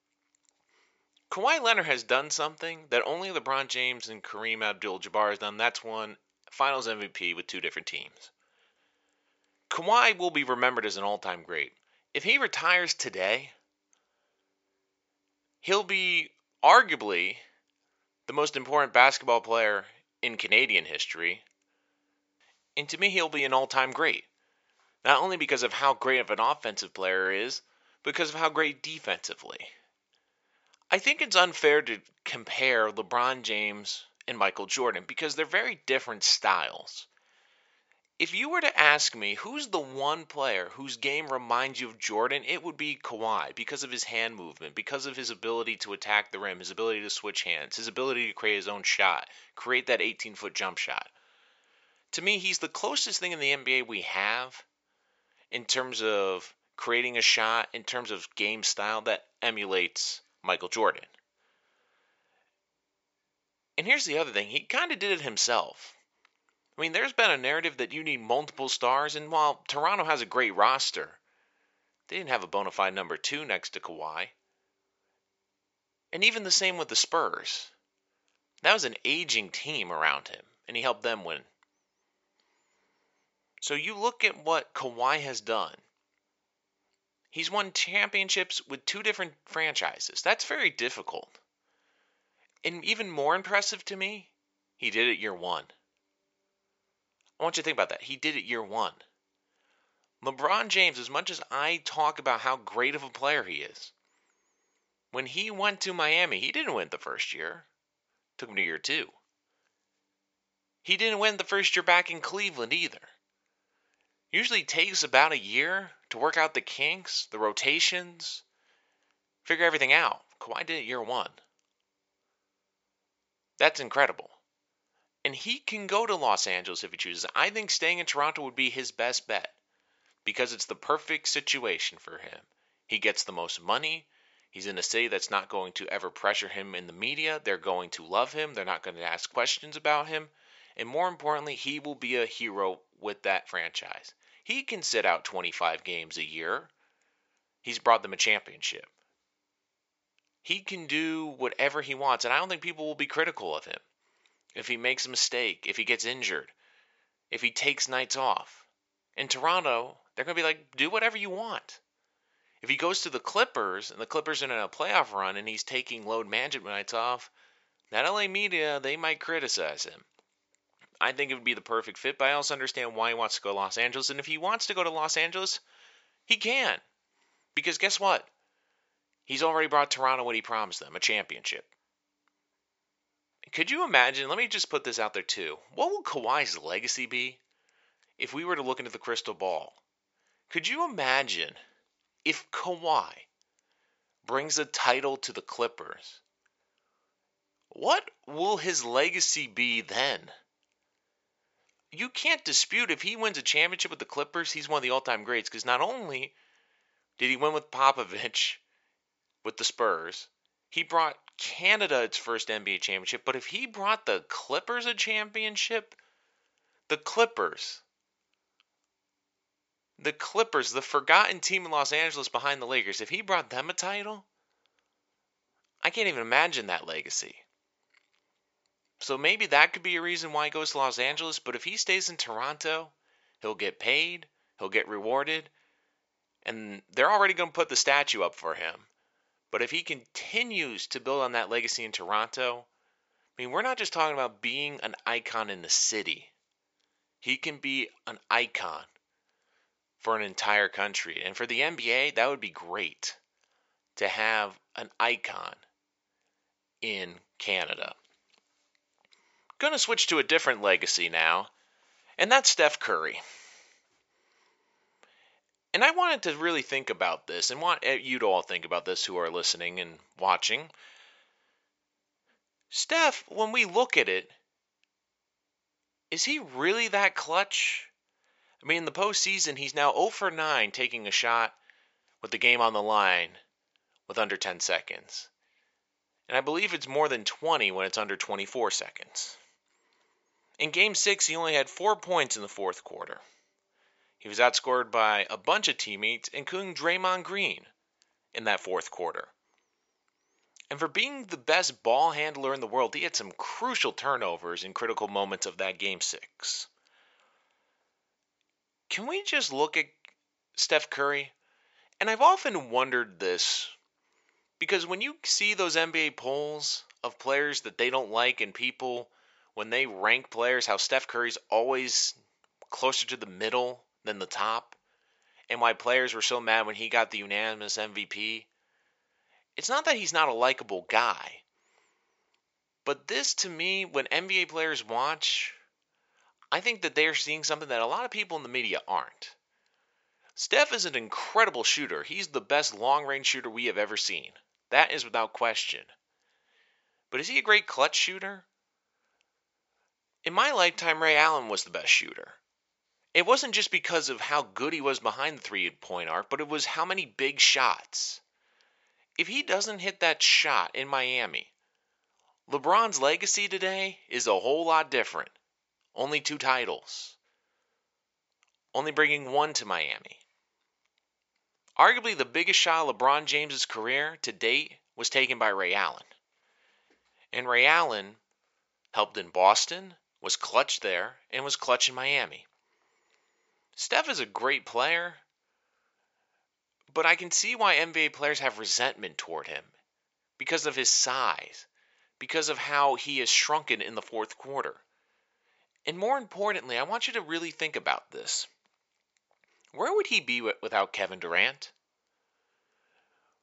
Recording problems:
thin; very; fading below 600 Hz
high frequencies cut off; noticeable; nothing above 8 kHz

